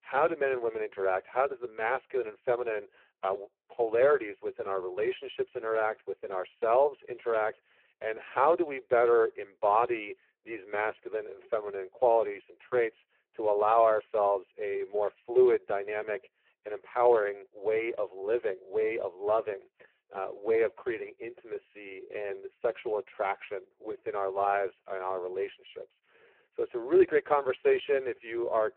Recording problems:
phone-call audio; poor line

